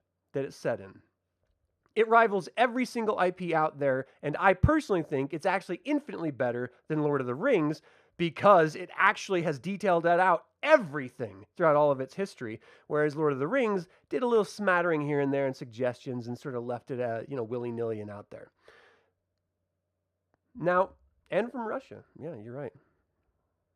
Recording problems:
muffled; slightly; fading above 2.5 kHz

